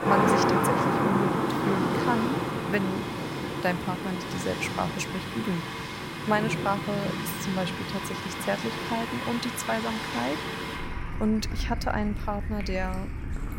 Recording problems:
rain or running water; very loud; throughout; 1 dB above the speech

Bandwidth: 16 kHz